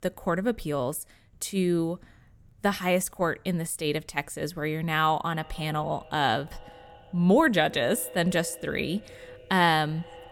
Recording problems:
echo of what is said; faint; from 5.5 s on; 100 ms later, 20 dB below the speech

